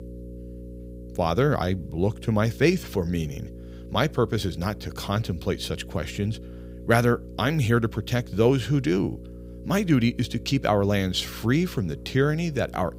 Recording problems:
electrical hum; faint; throughout; 60 Hz, 20 dB below the speech

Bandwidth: 15.5 kHz